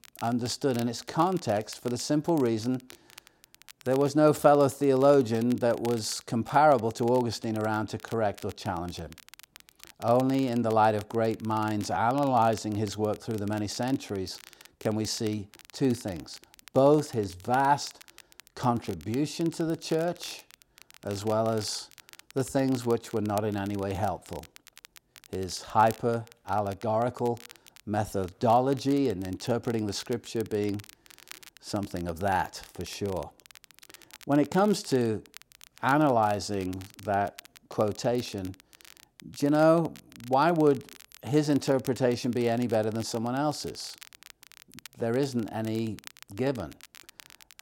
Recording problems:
crackle, like an old record; faint; 20 dB below the speech

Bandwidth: 16 kHz